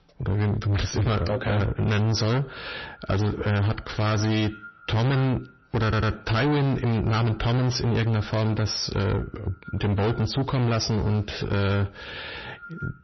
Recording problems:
distortion; heavy; 7 dB below the speech
echo of what is said; faint; throughout; 350 ms later, 25 dB below the speech
garbled, watery; slightly; nothing above 6 kHz
audio stuttering; at 6 s

